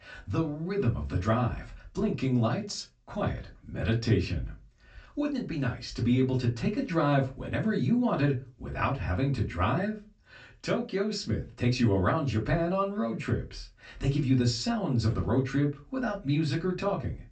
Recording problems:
off-mic speech; far
high frequencies cut off; noticeable; nothing above 8 kHz
room echo; very slight; dies away in 0.2 s

